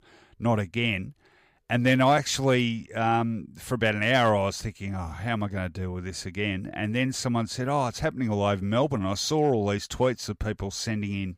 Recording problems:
none

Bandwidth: 15.5 kHz